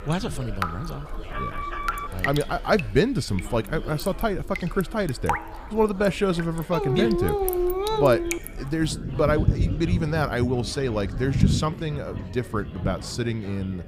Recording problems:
rain or running water; loud; throughout; 5 dB below the speech
chatter from many people; noticeable; throughout; 20 dB below the speech
alarm; noticeable; at 1.5 s; peak 6 dB below the speech
dog barking; loud; from 6.5 to 8.5 s; peak 1 dB above the speech

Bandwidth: 15 kHz